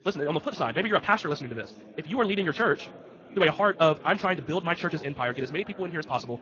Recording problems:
wrong speed, natural pitch; too fast; 1.7 times normal speed
garbled, watery; slightly; nothing above 6.5 kHz
background chatter; faint; throughout; 4 voices, 20 dB below the speech

